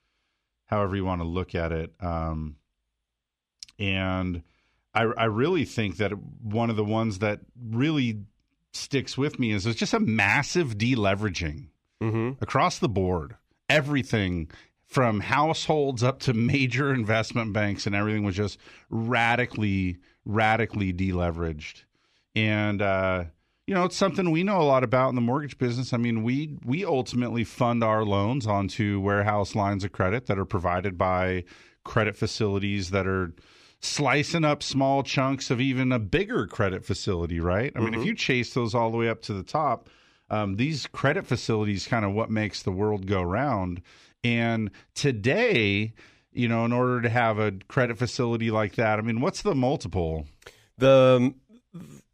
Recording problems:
none

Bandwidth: 14.5 kHz